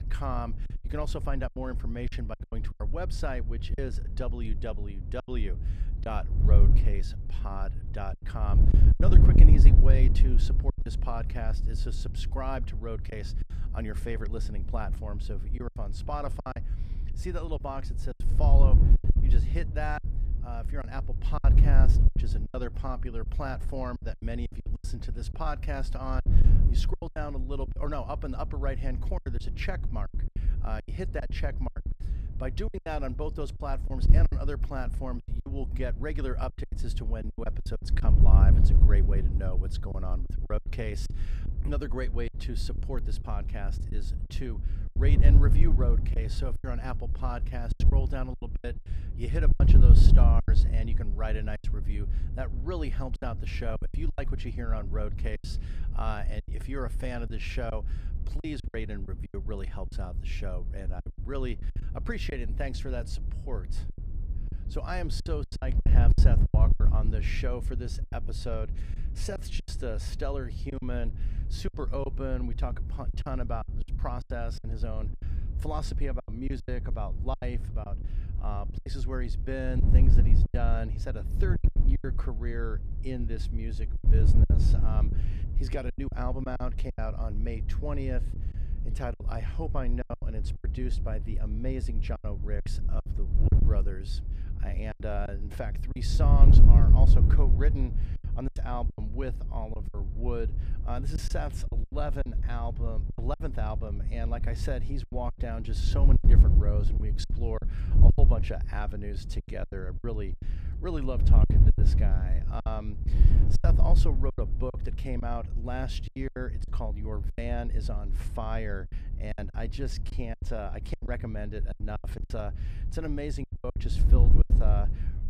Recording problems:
wind noise on the microphone; heavy; 7 dB below the speech
choppy; very; 10% of the speech affected

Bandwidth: 15 kHz